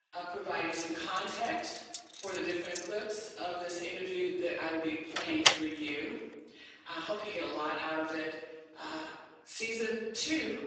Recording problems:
room echo; strong; dies away in 1.1 s
off-mic speech; far
garbled, watery; badly; nothing above 7.5 kHz
thin; very; fading below 350 Hz
jangling keys; noticeable; from 1 to 3 s; peak 5 dB below the speech
door banging; loud; at 5 s; peak 10 dB above the speech

